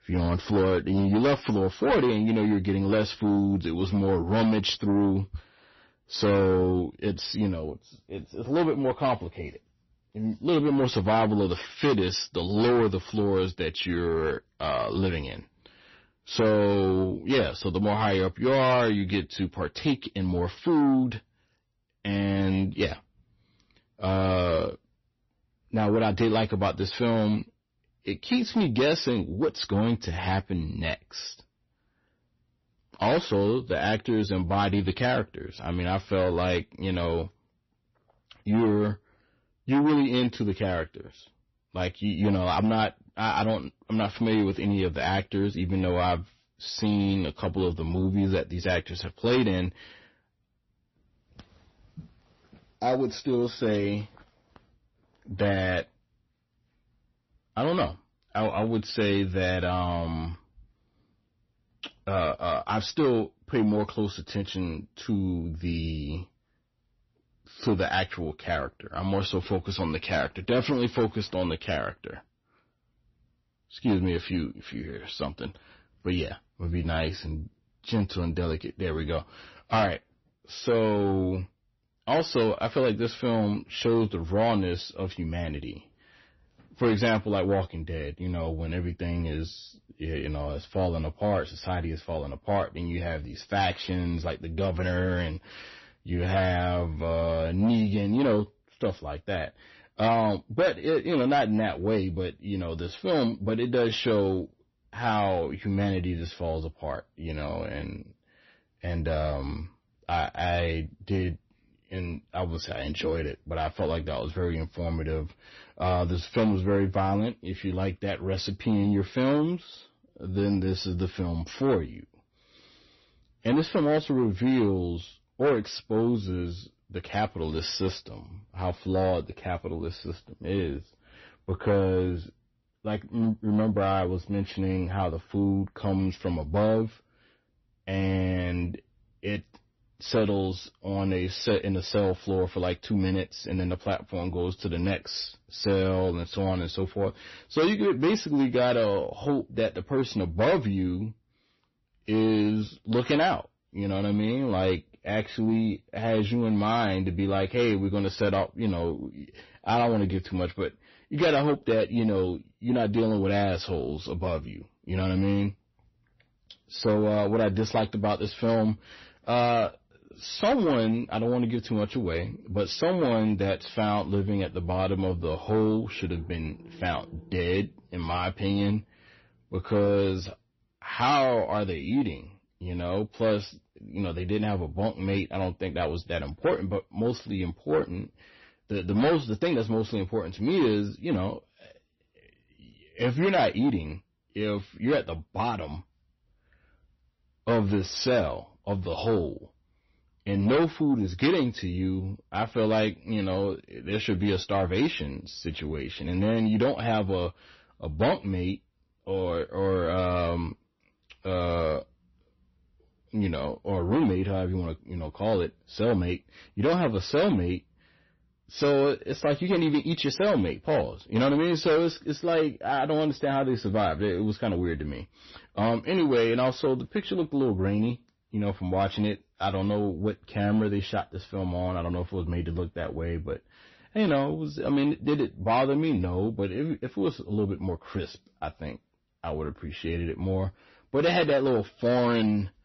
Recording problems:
distortion; slight; 10 dB below the speech
garbled, watery; slightly; nothing above 6 kHz

